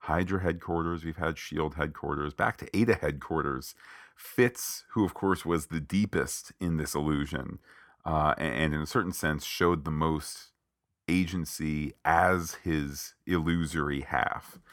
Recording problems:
none

